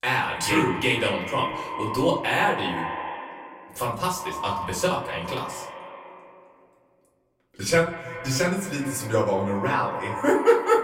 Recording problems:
echo of what is said; strong; throughout; 170 ms later, 9 dB below the speech
off-mic speech; far
room echo; slight; dies away in 0.4 s

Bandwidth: 16 kHz